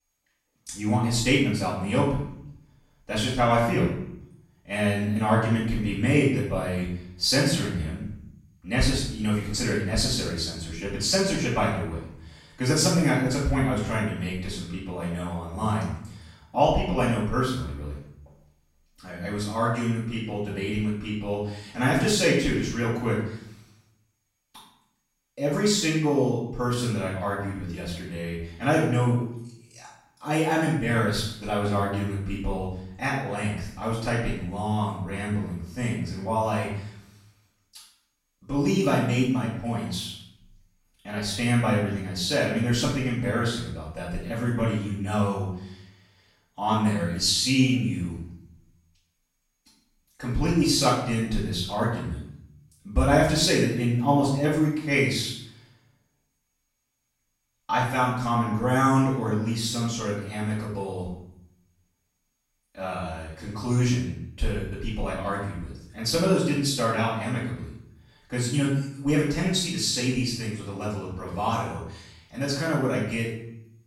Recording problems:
off-mic speech; far
room echo; noticeable; dies away in 0.6 s

